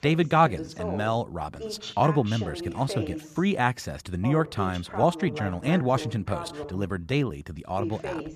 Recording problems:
voice in the background; noticeable; throughout; 10 dB below the speech

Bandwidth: 14.5 kHz